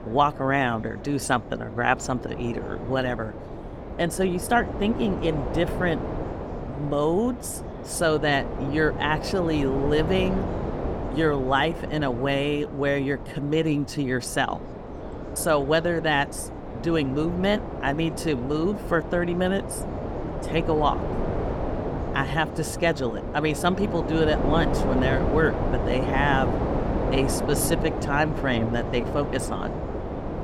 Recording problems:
wind noise on the microphone; heavy; 7 dB below the speech
background chatter; faint; throughout; 3 voices, 25 dB below the speech

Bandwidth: 18 kHz